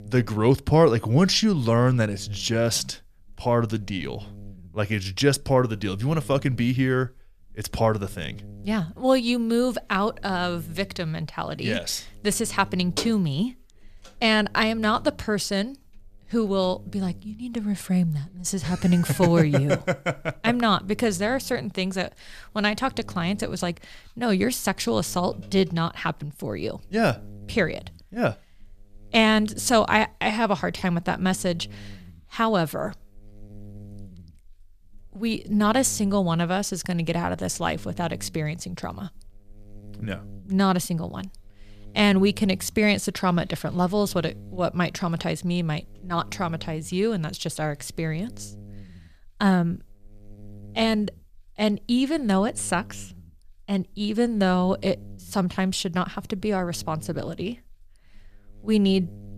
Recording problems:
electrical hum; very faint; throughout; 50 Hz, 30 dB below the speech

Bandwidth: 14.5 kHz